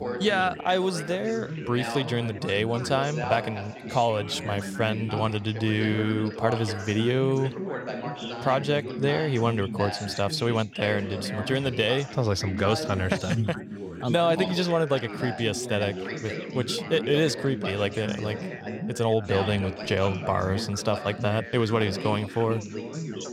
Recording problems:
background chatter; loud; throughout; 3 voices, 8 dB below the speech

